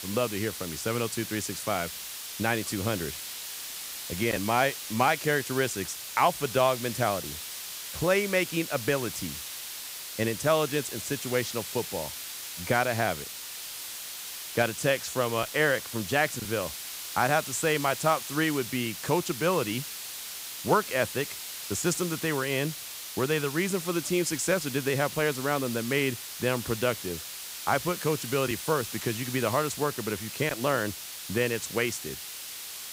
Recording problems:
hiss; loud; throughout; 7 dB below the speech

